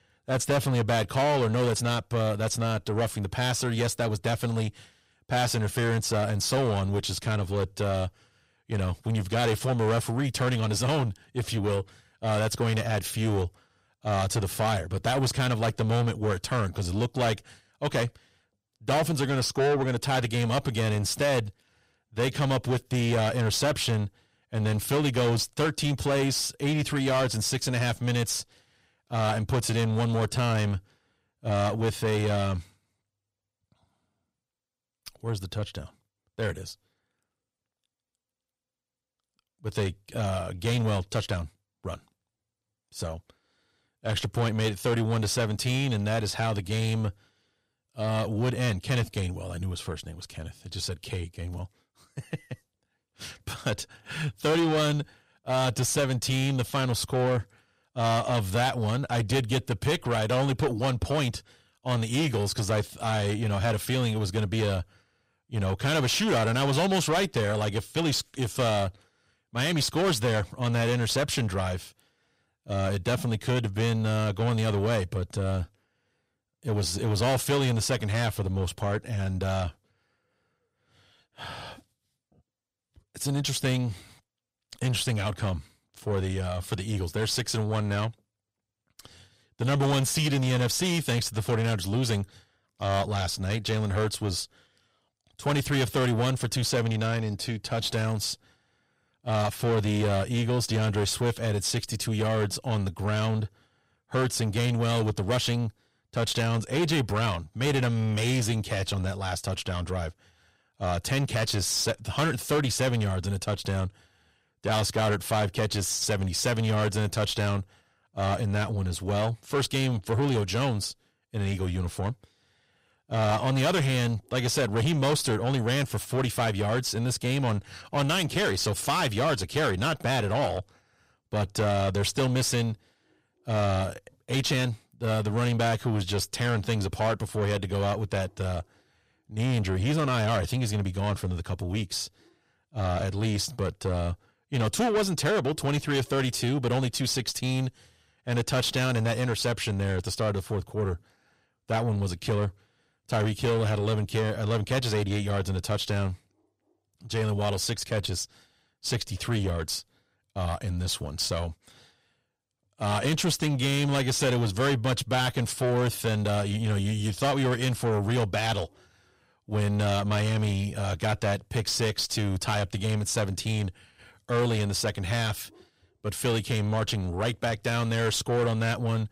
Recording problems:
distortion; heavy; 8 dB below the speech

